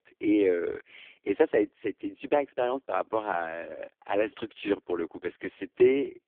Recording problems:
phone-call audio; poor line

